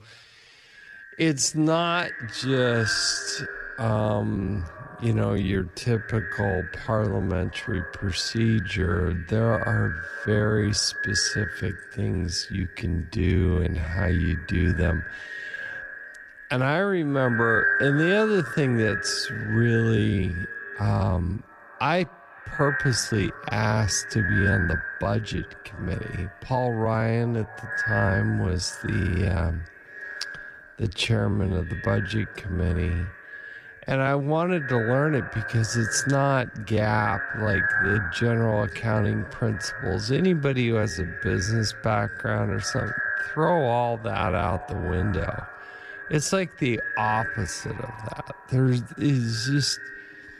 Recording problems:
echo of what is said; strong; throughout; 200 ms later, 6 dB below the speech
wrong speed, natural pitch; too slow; 0.6 times normal speed

